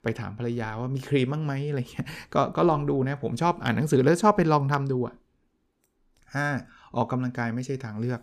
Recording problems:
none

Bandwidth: 15 kHz